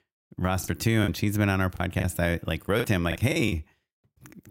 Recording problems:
choppy; very; from 0.5 to 2 s and at 3 s; 12% of the speech affected

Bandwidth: 16 kHz